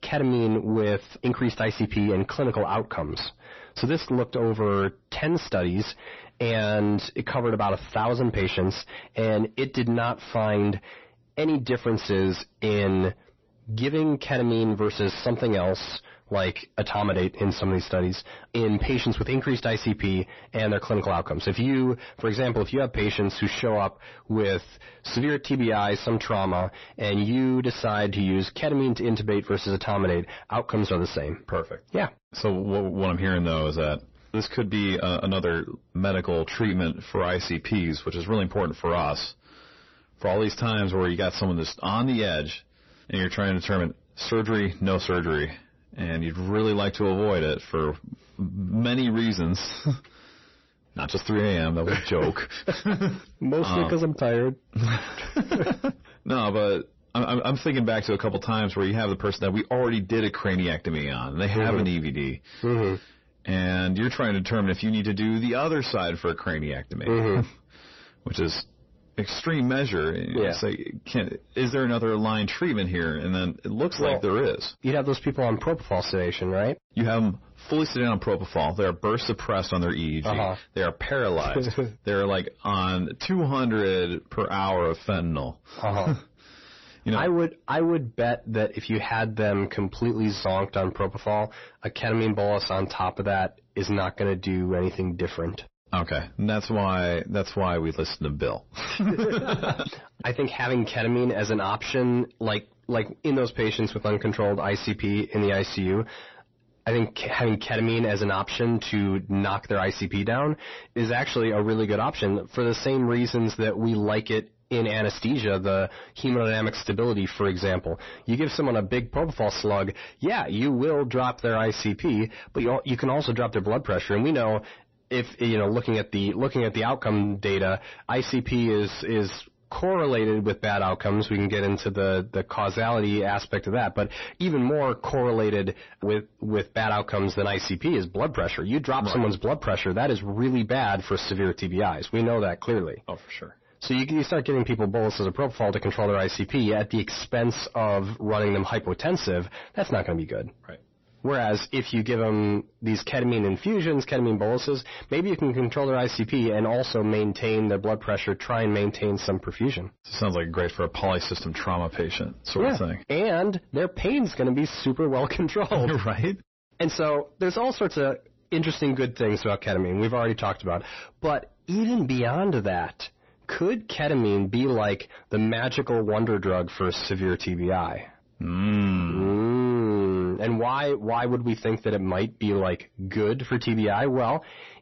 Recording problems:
distortion; slight; 10 dB below the speech
garbled, watery; slightly; nothing above 6 kHz

